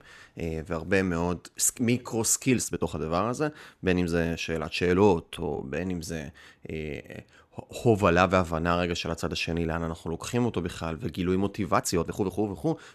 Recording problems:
uneven, jittery; strongly; from 1.5 to 12 s

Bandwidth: 13.5 kHz